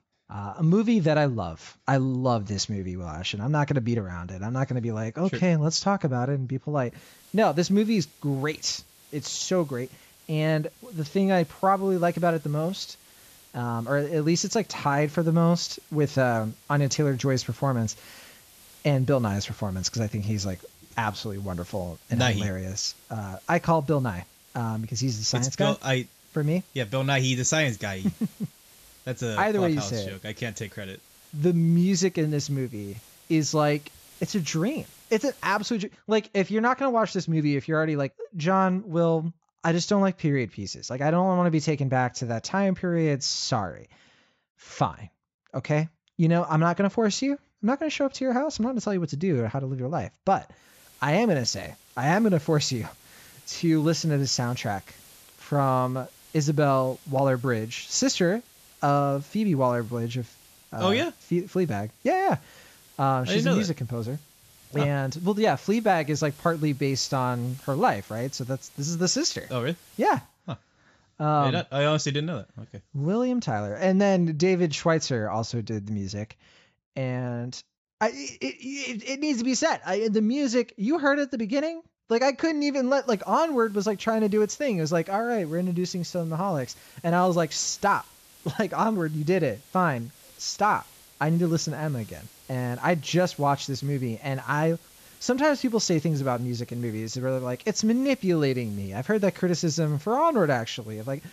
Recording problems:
high frequencies cut off; noticeable; nothing above 8 kHz
hiss; faint; from 7 to 36 s, from 51 s to 1:10 and from 1:23 on; 25 dB below the speech

